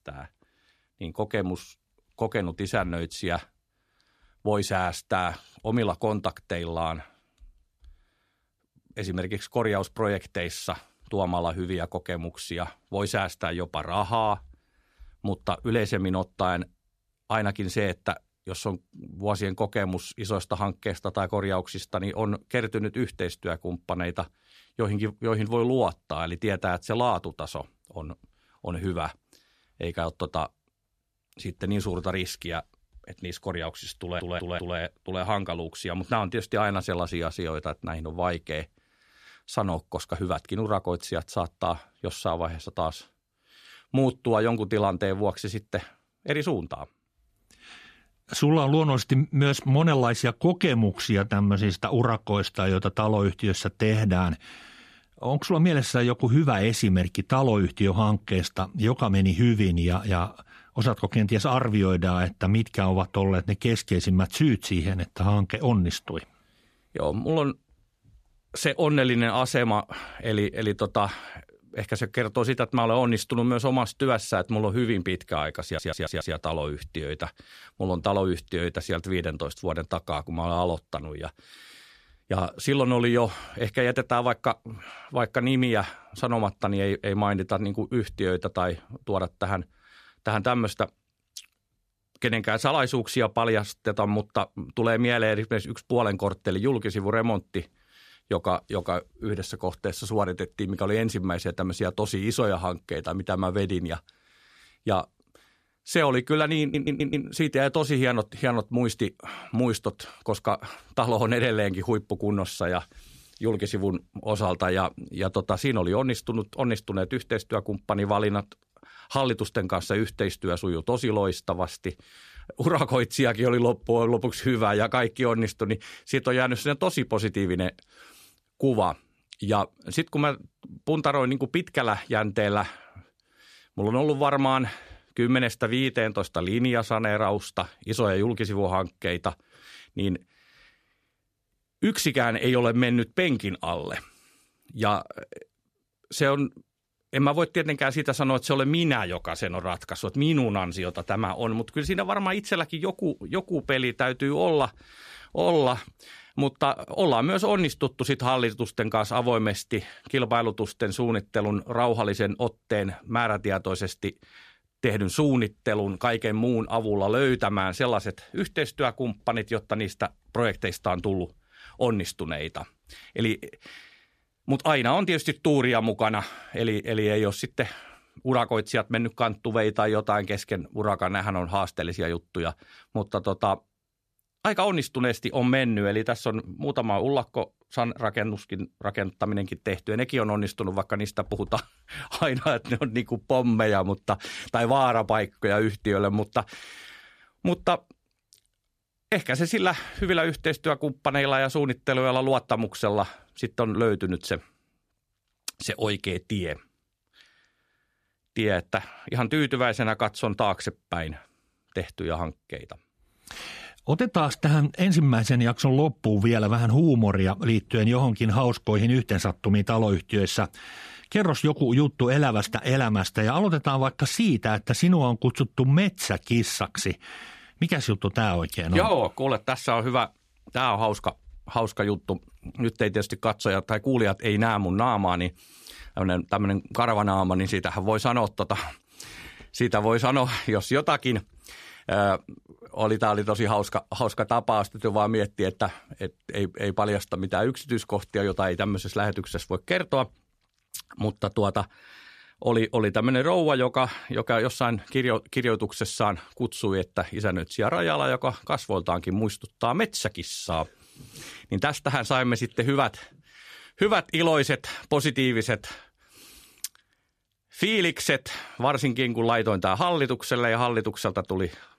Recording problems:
audio stuttering; at 34 s, at 1:16 and at 1:47

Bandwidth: 14.5 kHz